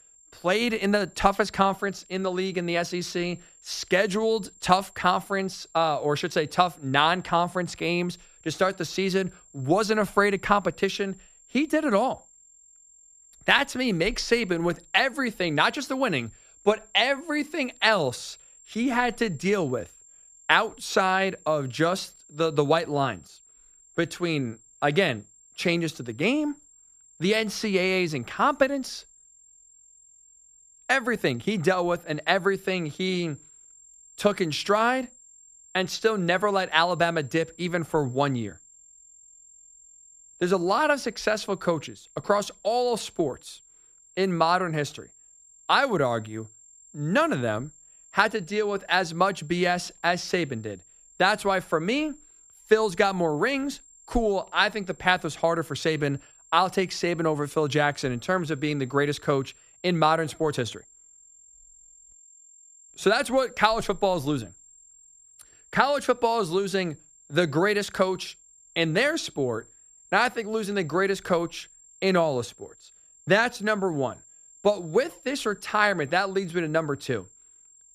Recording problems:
high-pitched whine; faint; throughout; 7.5 kHz, 25 dB below the speech

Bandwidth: 14.5 kHz